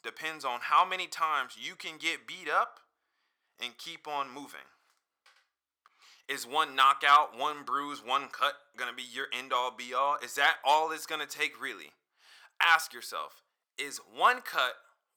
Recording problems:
thin; very; fading below 750 Hz

